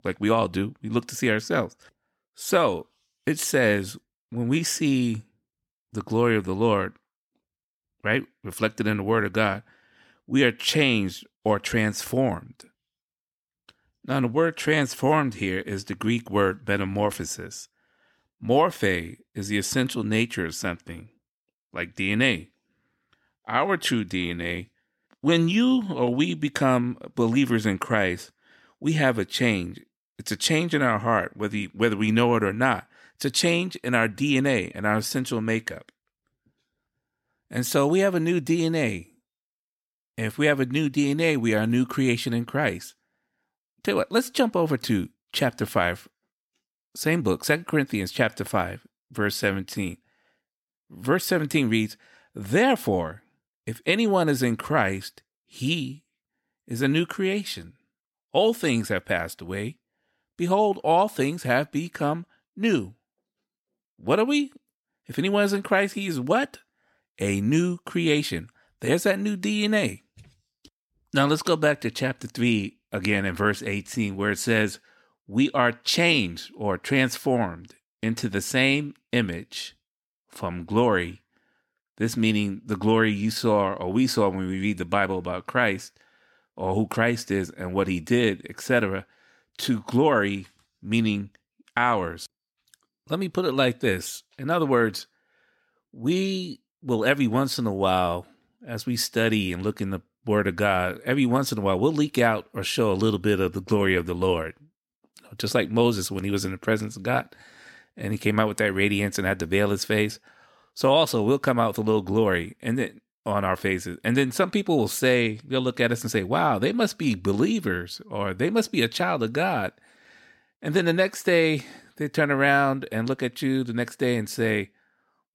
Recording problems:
none

